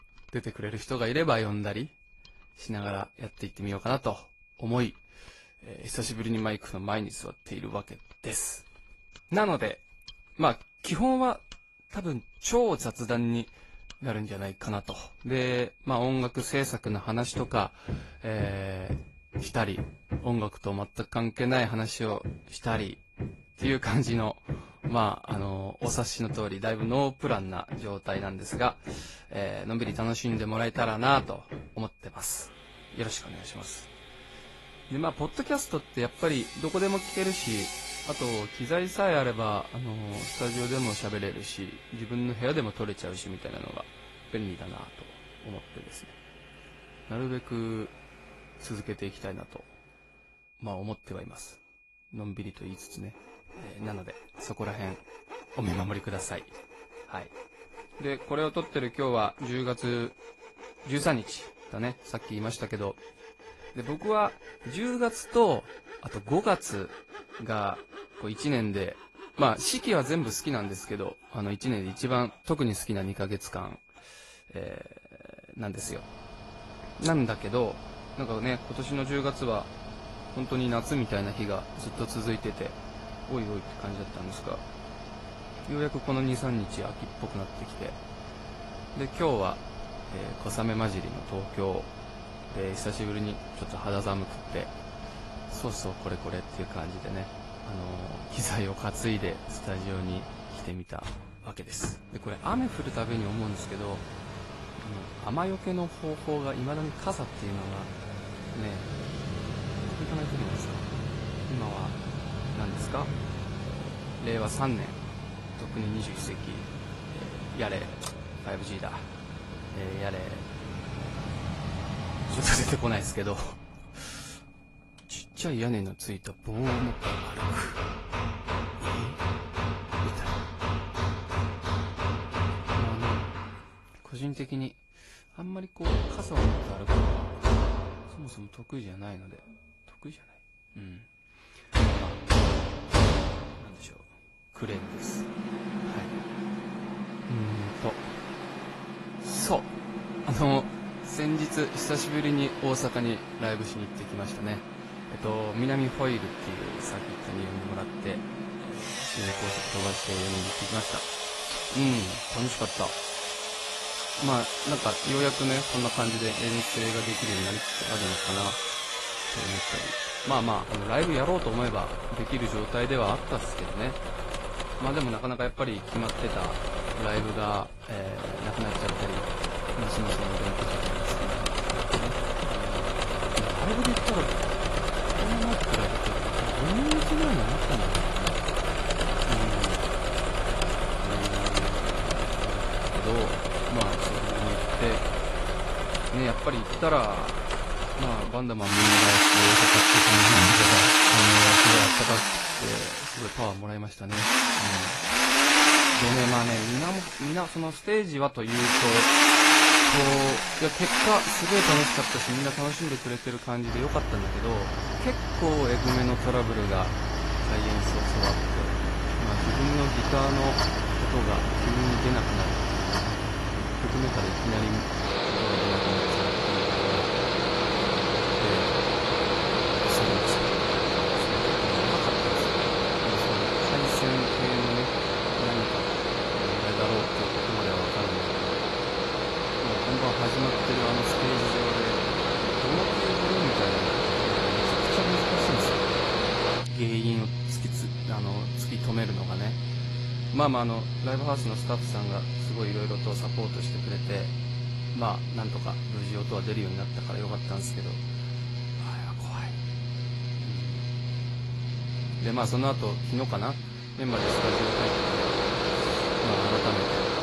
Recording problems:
garbled, watery; slightly; nothing above 11.5 kHz
machinery noise; very loud; throughout; 5 dB above the speech
high-pitched whine; faint; throughout; 2.5 kHz, 25 dB below the speech

